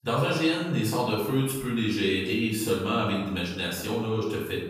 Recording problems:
off-mic speech; far
room echo; noticeable; dies away in 0.9 s

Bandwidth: 15 kHz